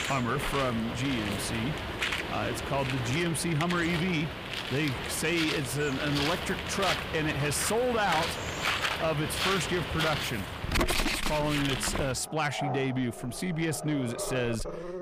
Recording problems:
distortion; slight; 10 dB below the speech
animal sounds; loud; throughout; 2 dB below the speech

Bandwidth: 15 kHz